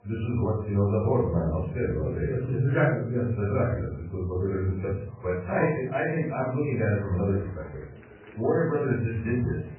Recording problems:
off-mic speech; far
garbled, watery; badly; nothing above 2.5 kHz
room echo; noticeable; dies away in 0.5 s
murmuring crowd; faint; throughout; 25 dB below the speech

